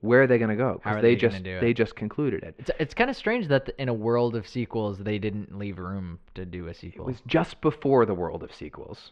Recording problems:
muffled; slightly; fading above 3 kHz

